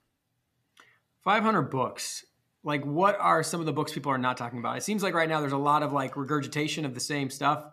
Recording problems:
none

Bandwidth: 14.5 kHz